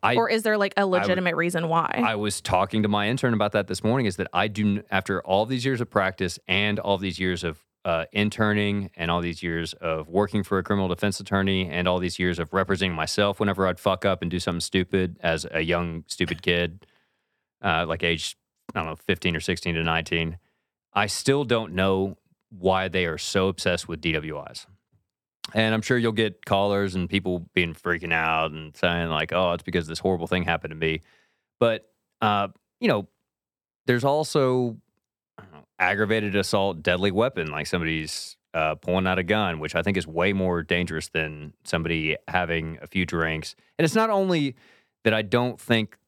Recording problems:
none

